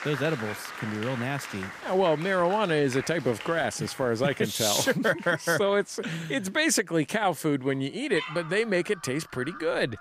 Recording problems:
animal sounds; noticeable; throughout; 20 dB below the speech
crowd noise; noticeable; throughout; 15 dB below the speech

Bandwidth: 15 kHz